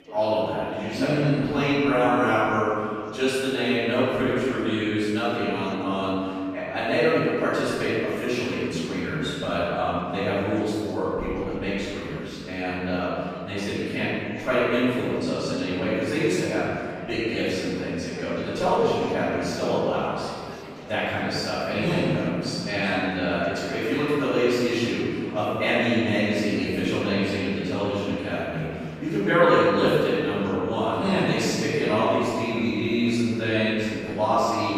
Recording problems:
room echo; strong; dies away in 2 s
off-mic speech; far
chatter from many people; noticeable; throughout; 20 dB below the speech

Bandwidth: 15 kHz